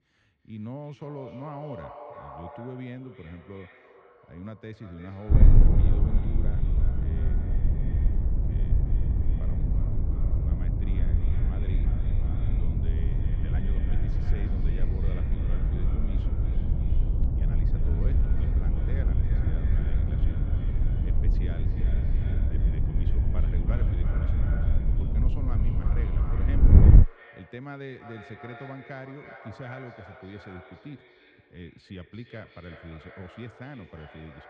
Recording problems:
echo of what is said; strong; throughout; 340 ms later, 7 dB below the speech
muffled; very; fading above 2.5 kHz
wind noise on the microphone; heavy; from 5.5 to 27 s; 5 dB above the speech

